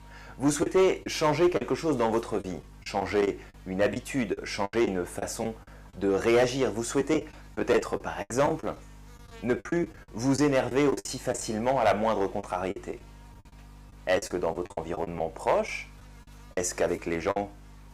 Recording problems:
distortion; slight; 3% of the sound clipped
electrical hum; faint; throughout; 50 Hz, 25 dB below the speech
choppy; very; 10% of the speech affected

